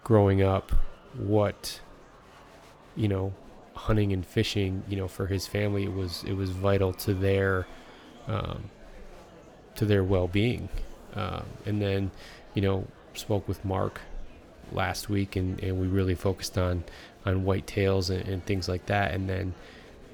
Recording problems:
murmuring crowd; faint; throughout; 20 dB below the speech

